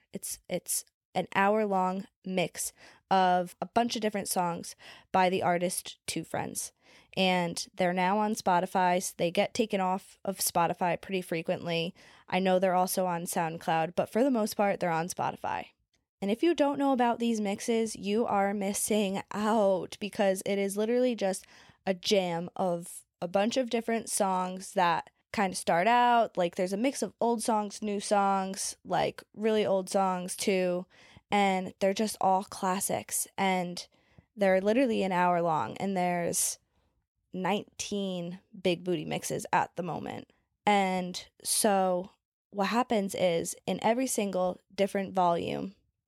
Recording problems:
none

